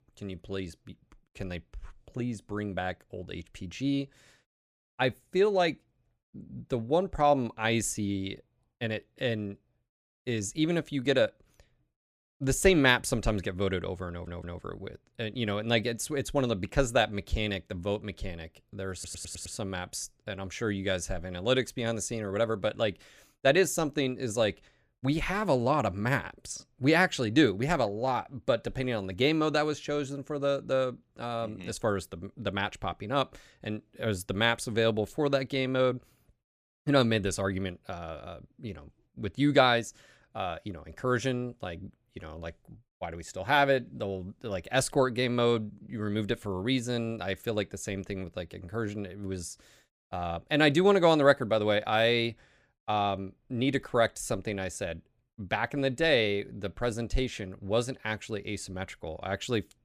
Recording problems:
audio stuttering; at 14 s and at 19 s

